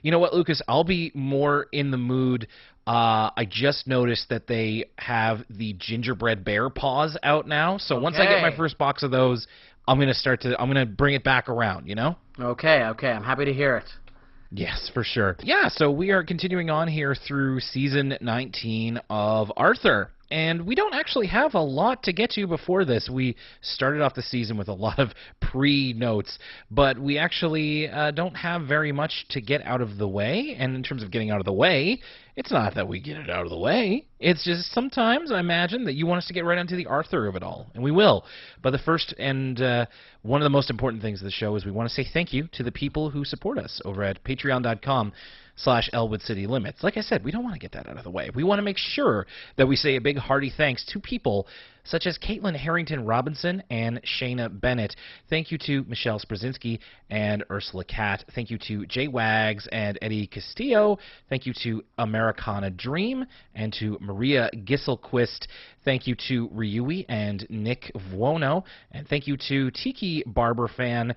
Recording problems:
garbled, watery; badly; nothing above 5.5 kHz

